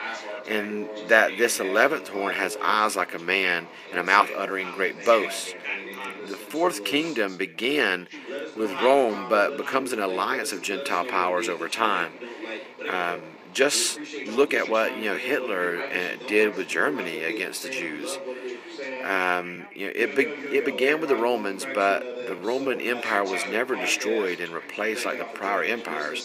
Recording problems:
thin; somewhat; fading below 250 Hz
background chatter; loud; throughout; 3 voices, 10 dB below the speech
uneven, jittery; strongly; from 2 to 23 s

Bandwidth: 14.5 kHz